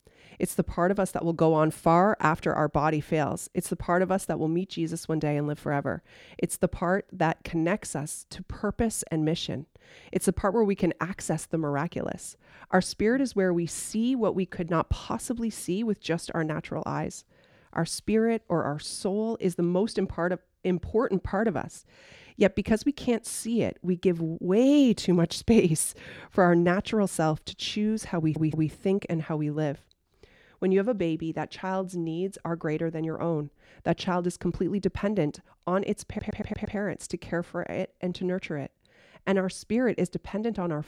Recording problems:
audio stuttering; at 28 s and at 36 s

